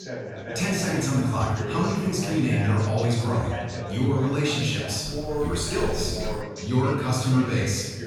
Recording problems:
room echo; strong; dies away in 1.3 s
off-mic speech; far
background chatter; loud; throughout; 4 voices, 9 dB below the speech
dog barking; faint; from 5 to 6.5 s; peak 10 dB below the speech

